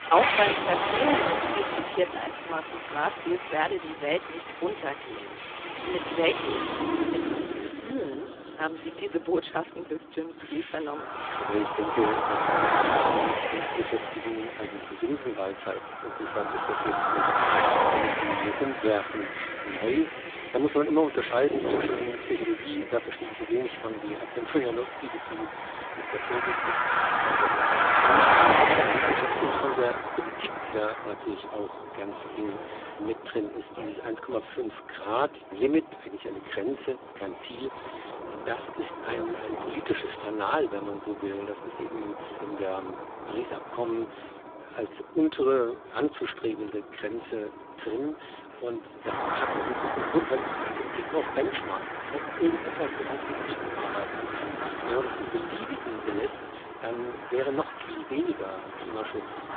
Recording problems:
phone-call audio; poor line
traffic noise; very loud; throughout; 2 dB above the speech

